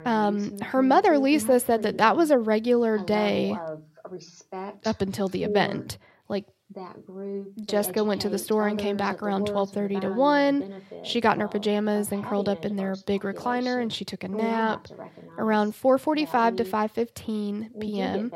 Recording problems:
voice in the background; noticeable; throughout; 10 dB below the speech

